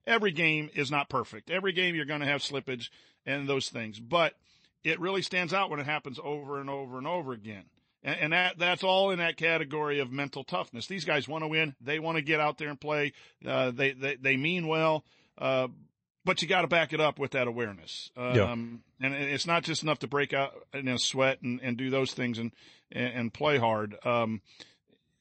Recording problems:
garbled, watery; slightly; nothing above 8 kHz

